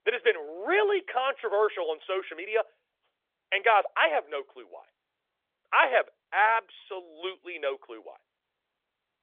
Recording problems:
phone-call audio; nothing above 3.5 kHz

